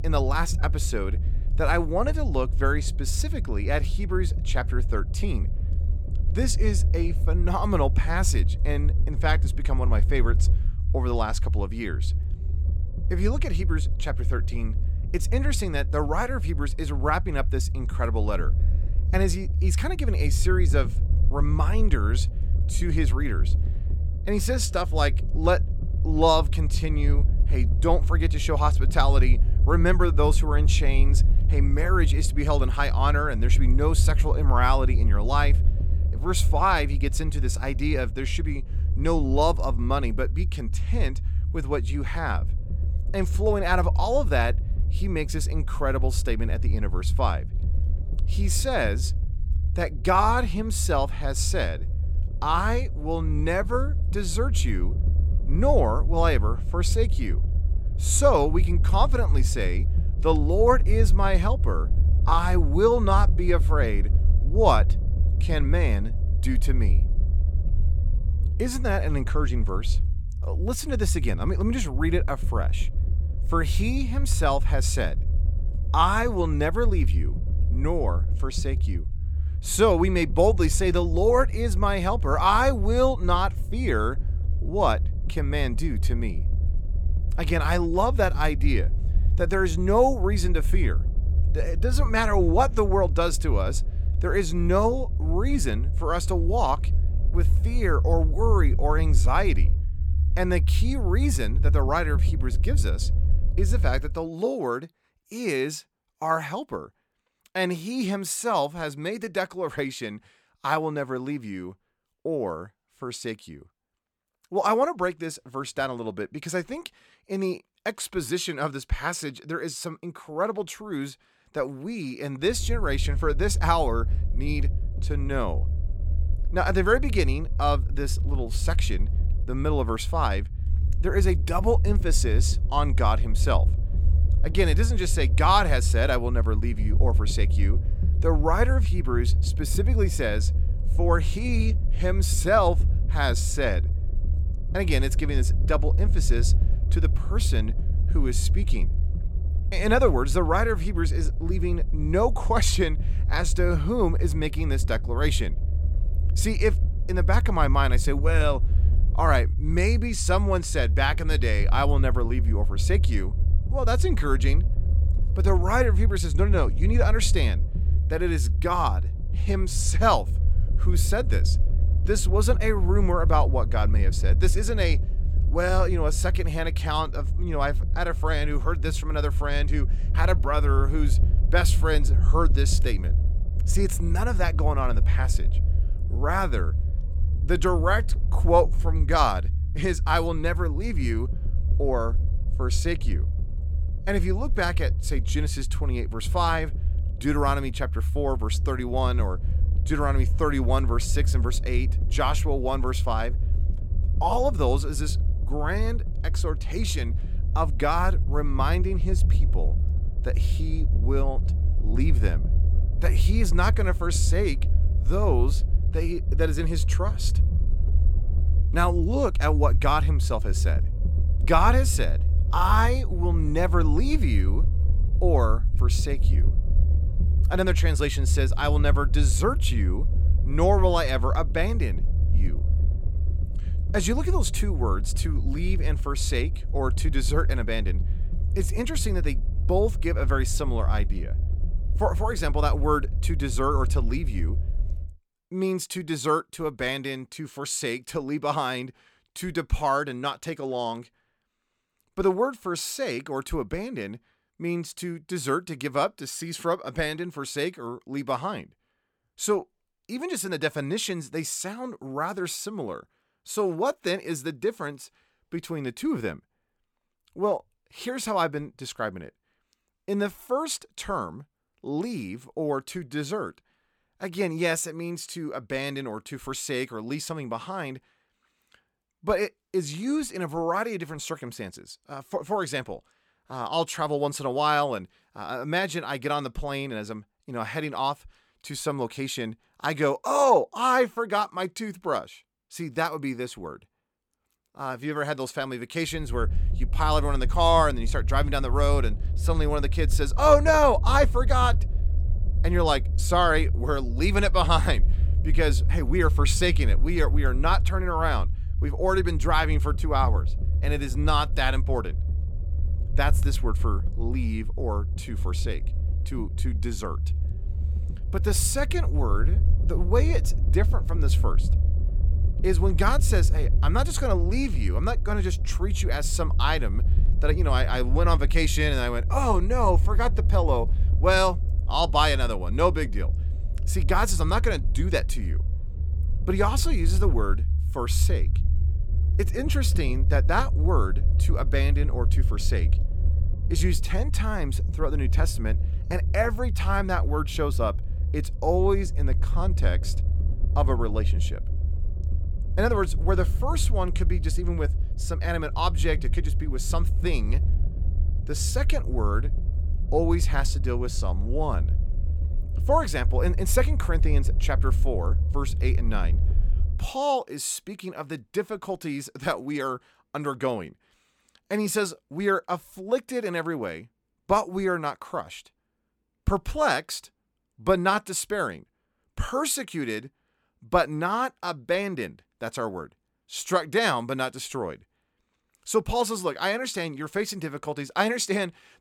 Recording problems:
low rumble; noticeable; until 1:44, from 2:03 to 4:05 and from 4:56 to 6:07; 15 dB below the speech

